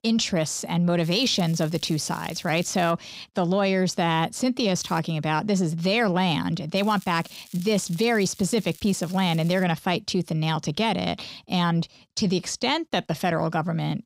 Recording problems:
crackling; faint; from 1 to 3 s, at 5 s and from 7 to 9.5 s; 20 dB below the speech

